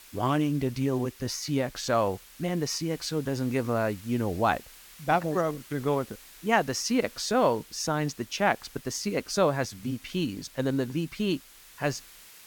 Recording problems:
hiss; faint; throughout; 20 dB below the speech

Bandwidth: 18 kHz